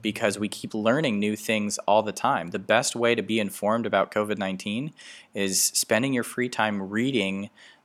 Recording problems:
none

